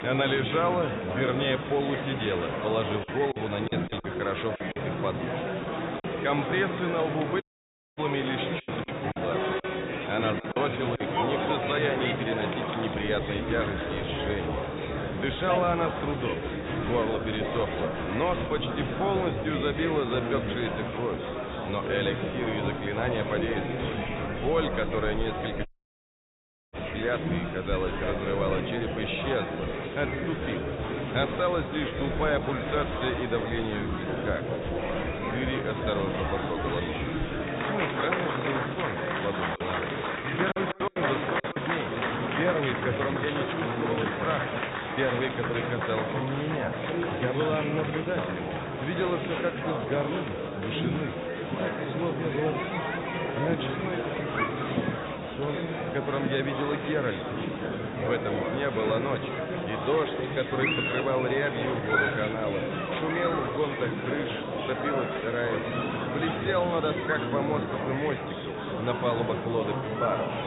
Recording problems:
high frequencies cut off; severe; nothing above 4 kHz
echo of what is said; noticeable; throughout; 170 ms later, 15 dB below the speech
murmuring crowd; very loud; throughout; as loud as the speech
choppy; very; from 3 to 5 s, from 8.5 to 11 s and from 40 to 42 s; 13% of the speech affected
audio cutting out; at 7.5 s for 0.5 s and at 26 s for 1 s

